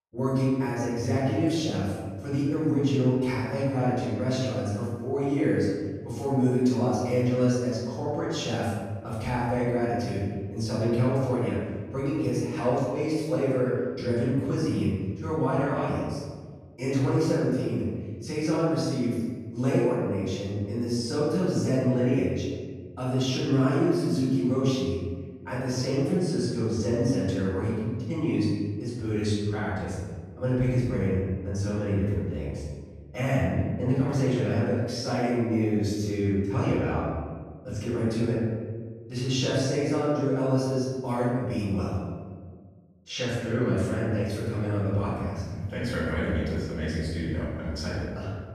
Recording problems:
room echo; strong; dies away in 1.5 s
off-mic speech; far

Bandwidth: 14.5 kHz